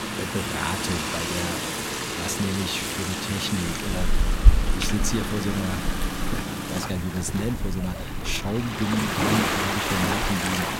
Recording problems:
rain or running water; very loud; throughout; 3 dB above the speech

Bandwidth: 16 kHz